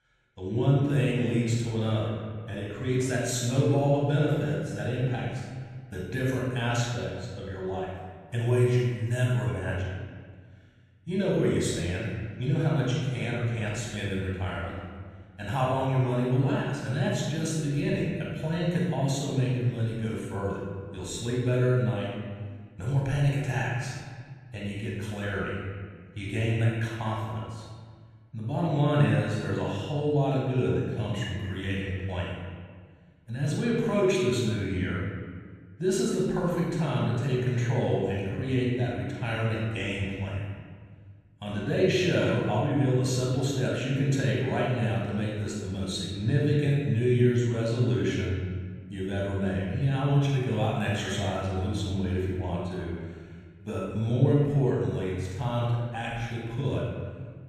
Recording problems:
room echo; strong; dies away in 1.6 s
off-mic speech; far

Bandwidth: 14.5 kHz